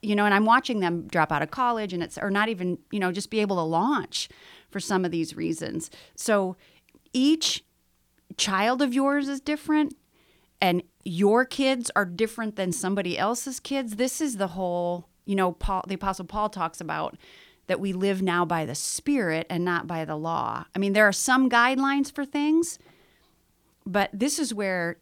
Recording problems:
none

